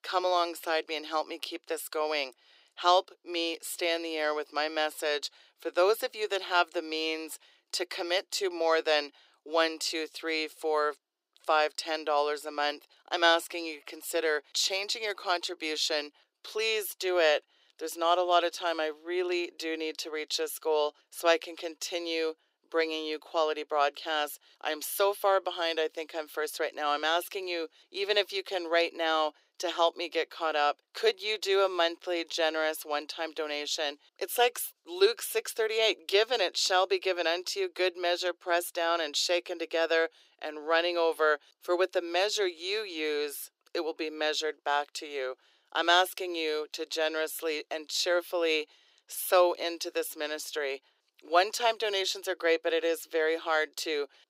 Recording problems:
thin; very; fading below 350 Hz

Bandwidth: 15.5 kHz